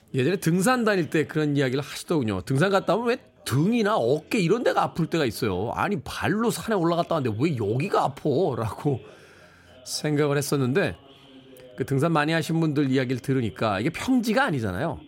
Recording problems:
background chatter; faint; throughout; 2 voices, 25 dB below the speech

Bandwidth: 16 kHz